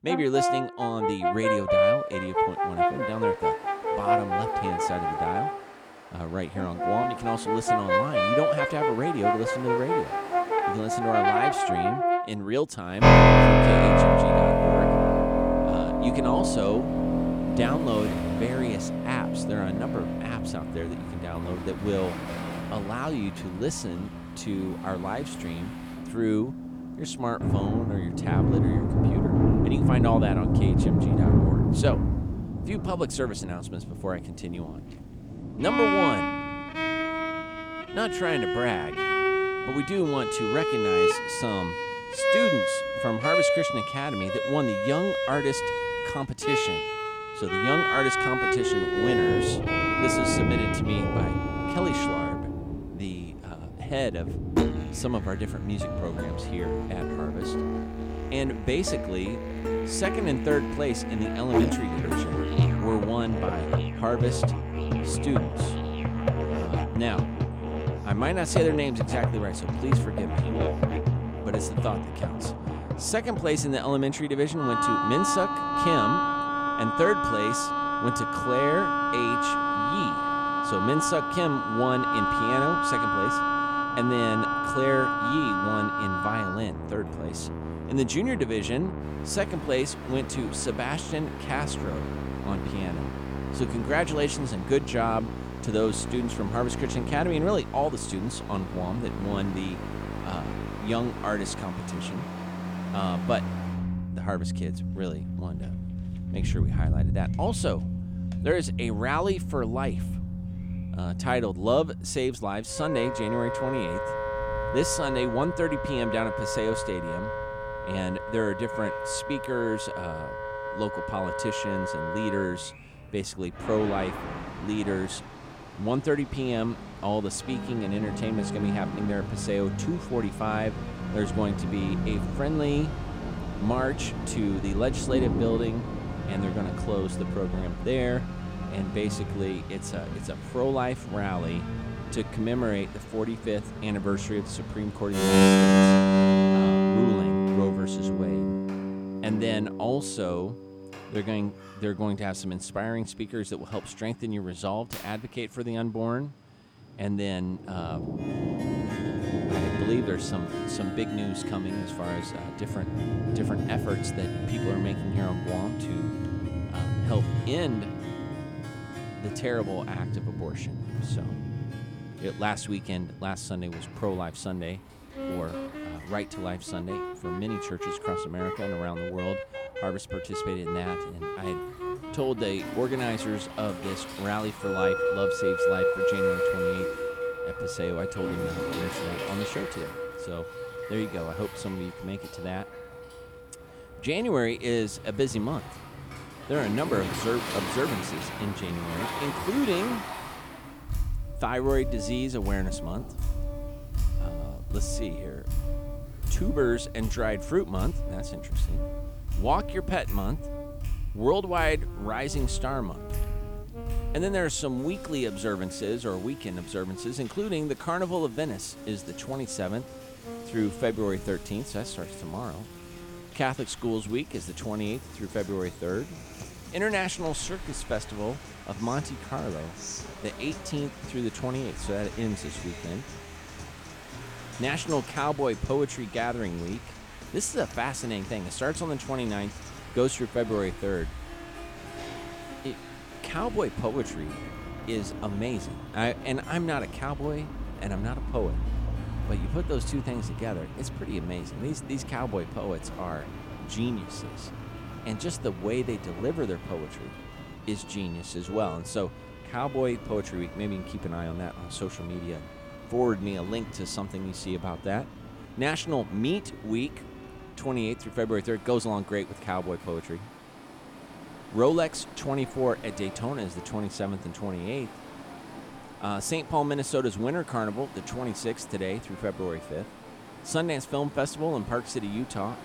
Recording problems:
background music; very loud; throughout; 2 dB above the speech
rain or running water; loud; throughout; 5 dB below the speech

